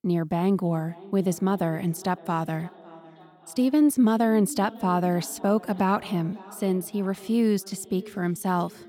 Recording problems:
echo of what is said; faint; throughout; 560 ms later, 20 dB below the speech

